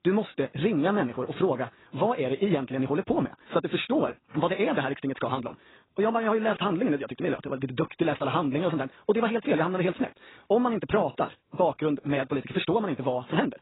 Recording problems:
garbled, watery; badly; nothing above 4 kHz
wrong speed, natural pitch; too fast; 1.7 times normal speed

